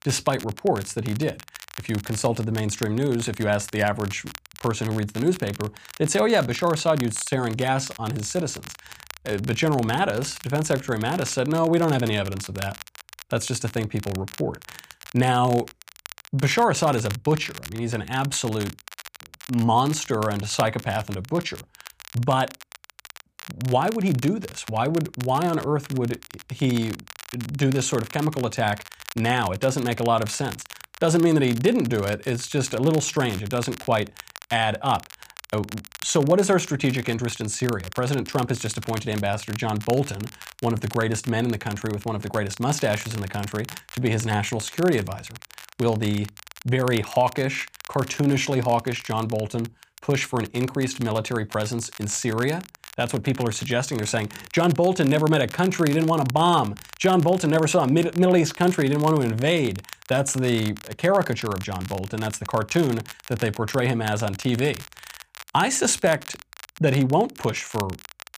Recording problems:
crackle, like an old record; noticeable; 15 dB below the speech

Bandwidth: 15 kHz